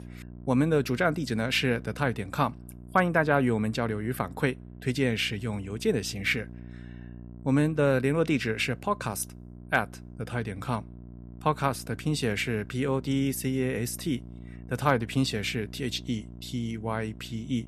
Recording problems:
electrical hum; faint; throughout; 60 Hz, 25 dB below the speech

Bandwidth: 13.5 kHz